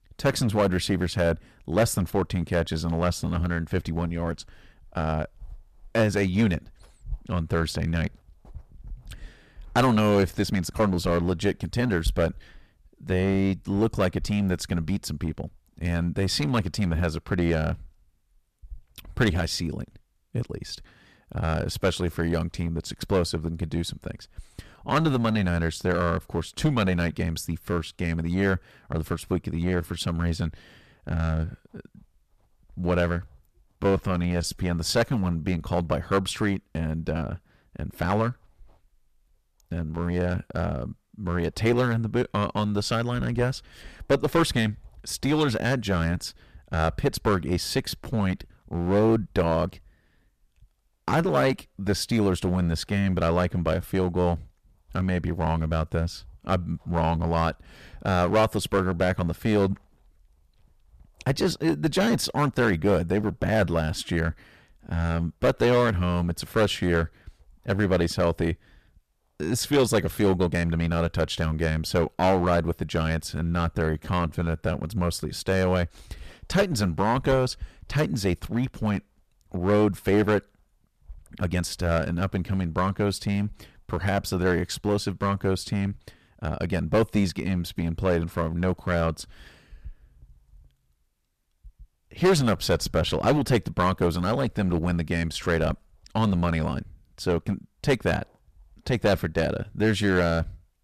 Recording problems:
distortion; heavy; 6% of the sound clipped
uneven, jittery; strongly; from 5 s to 1:30

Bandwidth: 14.5 kHz